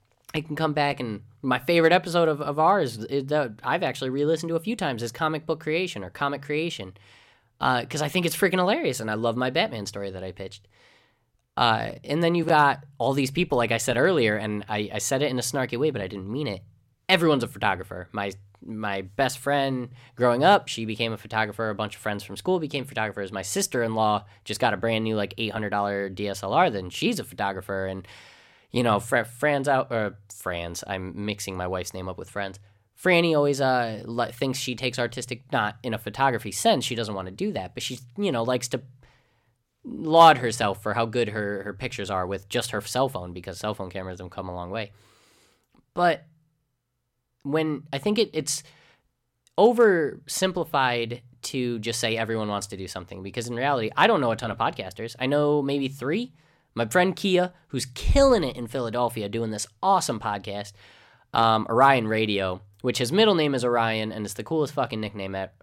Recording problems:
none

